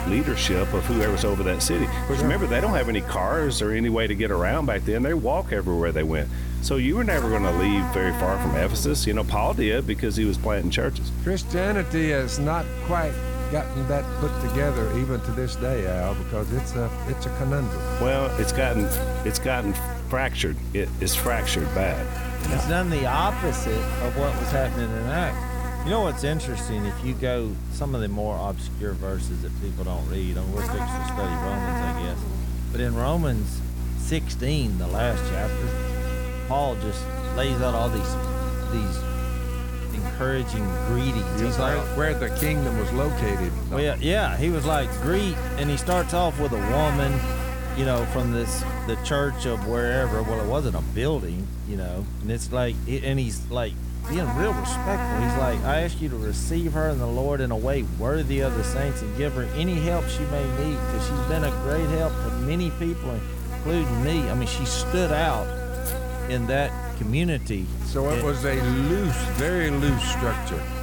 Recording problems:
electrical hum; loud; throughout; 60 Hz, 6 dB below the speech

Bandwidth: 18 kHz